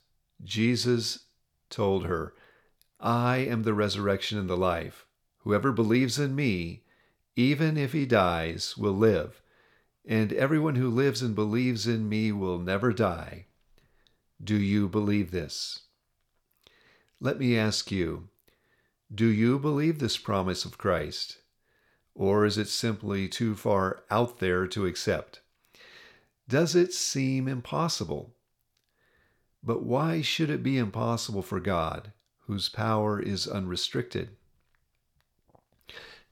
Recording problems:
none

